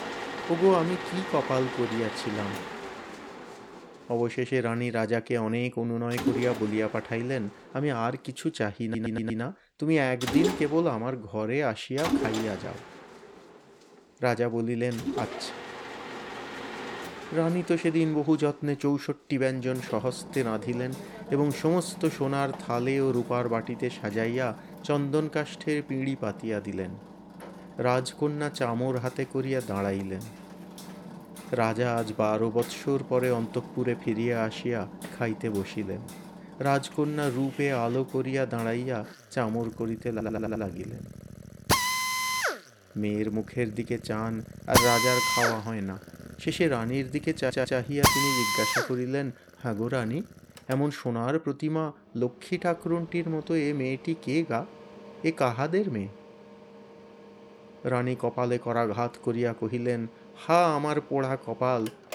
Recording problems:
machinery noise; loud; throughout; 4 dB below the speech
audio stuttering; at 9 s, at 40 s and at 47 s

